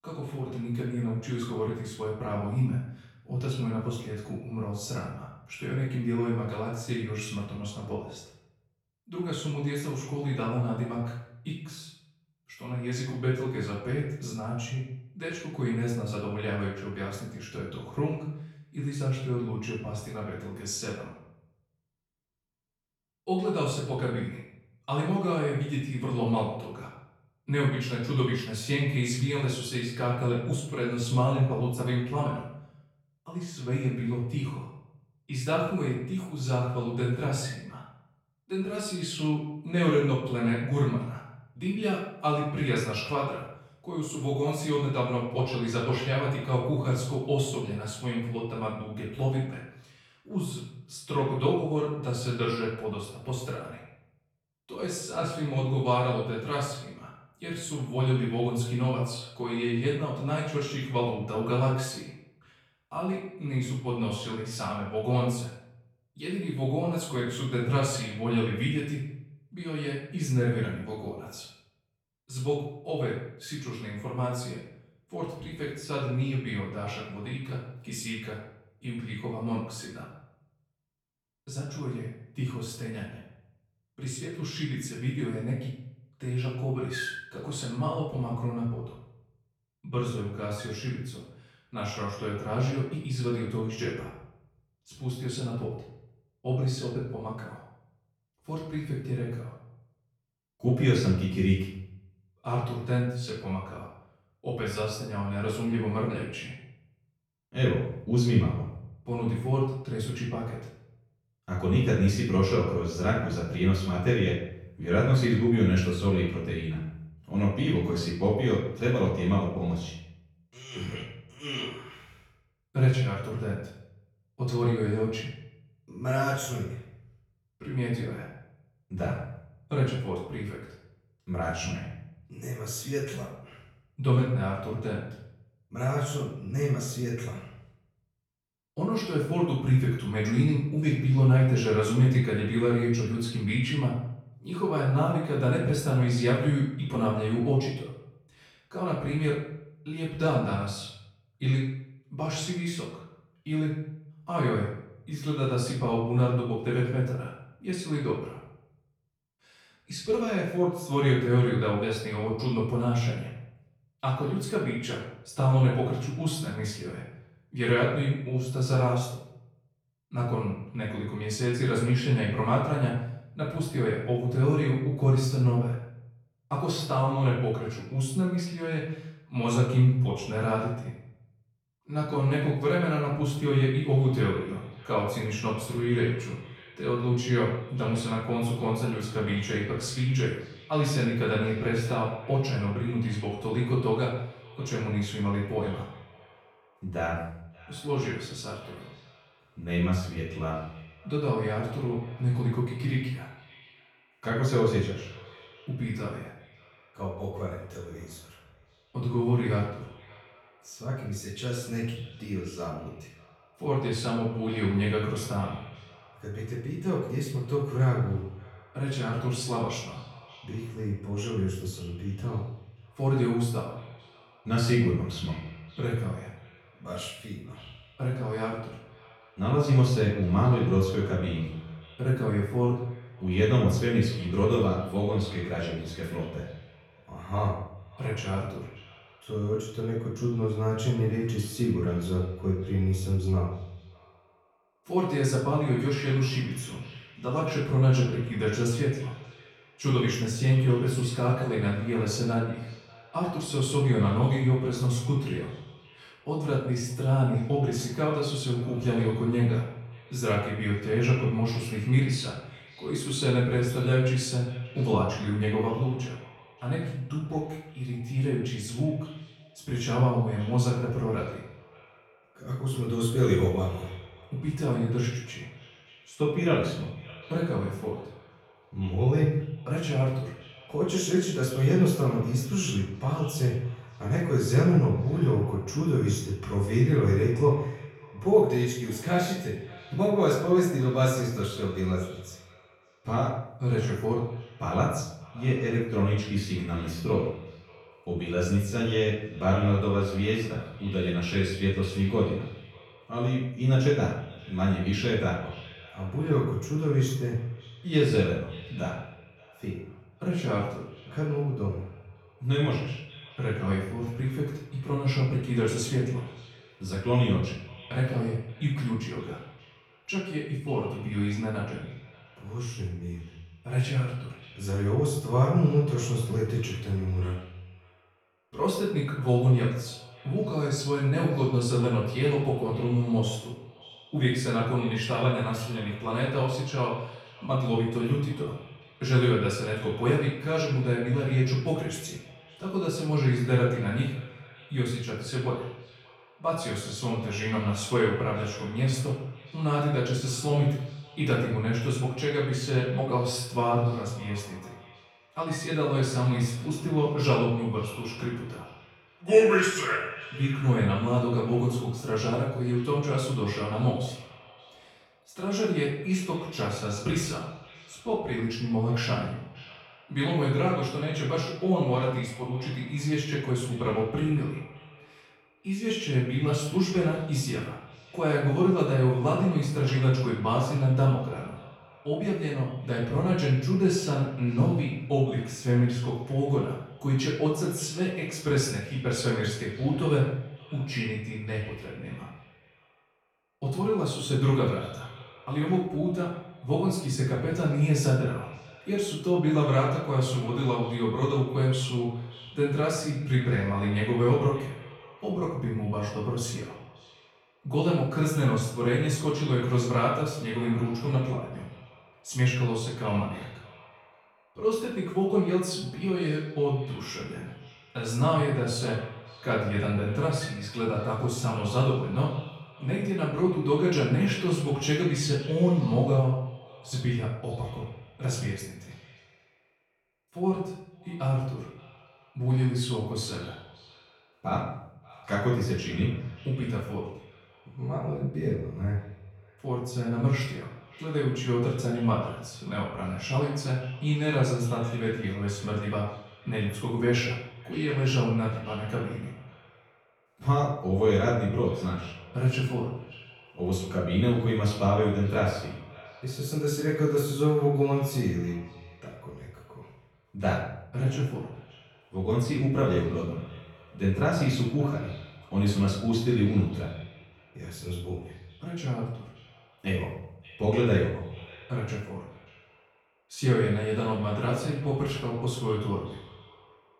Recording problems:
off-mic speech; far
room echo; noticeable; dies away in 0.6 s
echo of what is said; faint; from 3:04 on; 580 ms later, 25 dB below the speech

